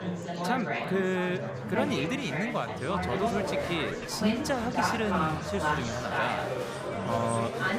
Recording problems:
murmuring crowd; very loud; throughout; 1 dB above the speech

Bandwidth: 15.5 kHz